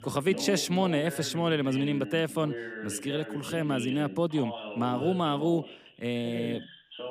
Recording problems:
background chatter; loud; throughout; 2 voices, 10 dB below the speech

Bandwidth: 15 kHz